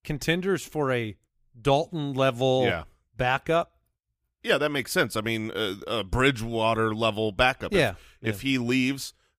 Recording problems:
none

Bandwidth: 15 kHz